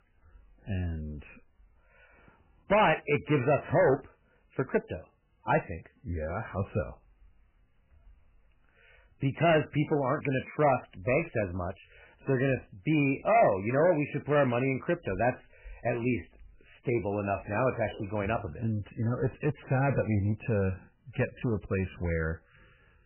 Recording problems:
distortion; heavy; 4% of the sound clipped
garbled, watery; badly; nothing above 3 kHz

